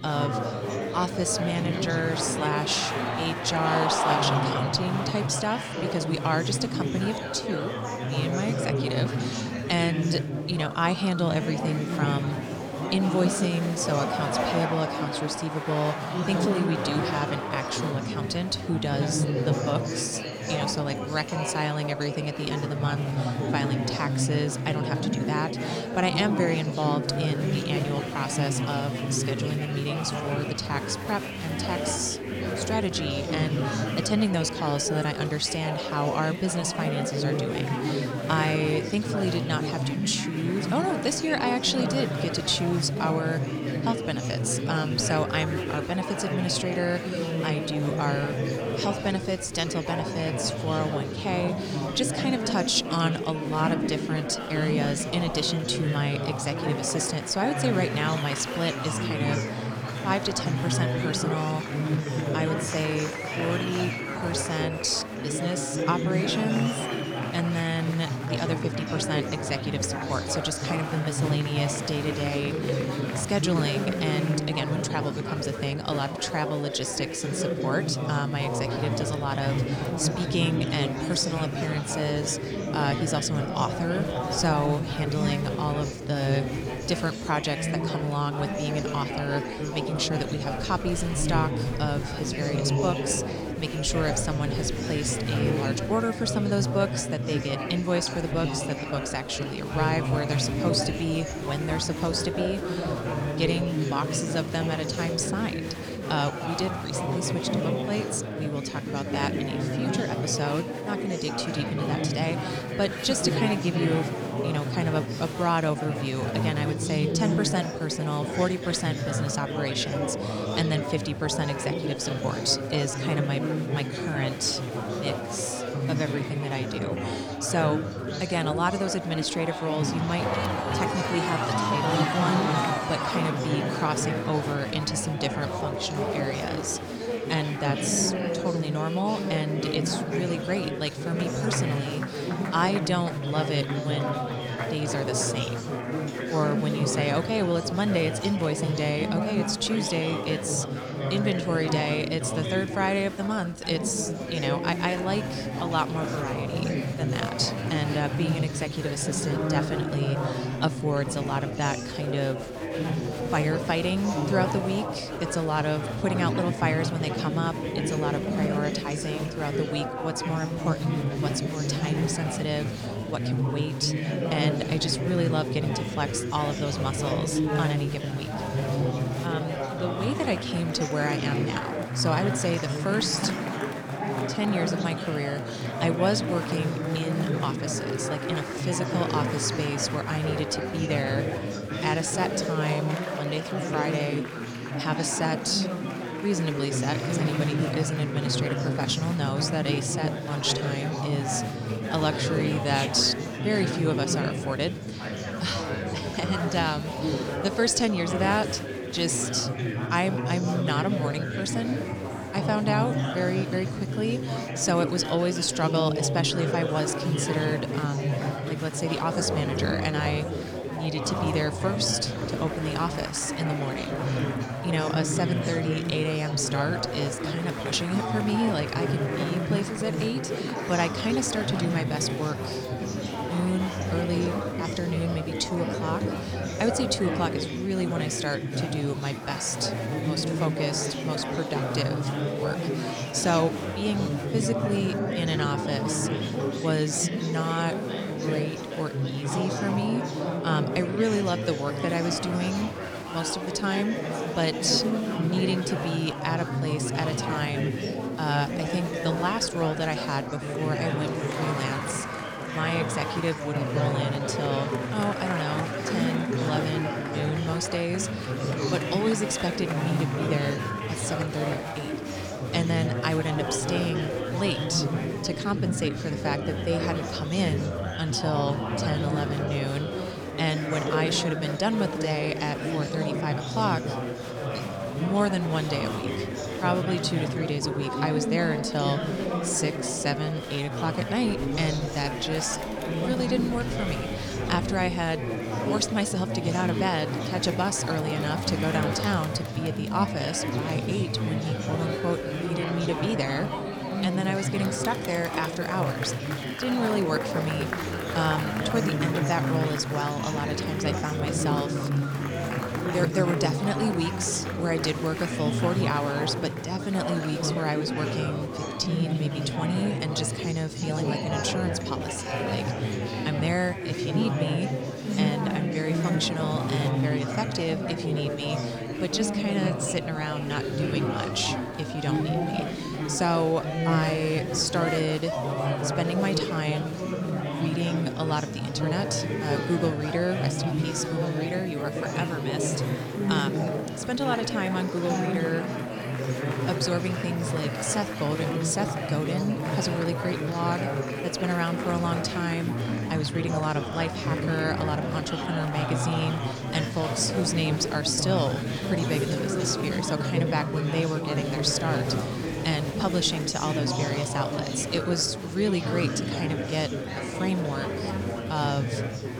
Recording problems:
chatter from many people; loud; throughout; 1 dB below the speech
rain or running water; faint; from 3:38 on; 25 dB below the speech

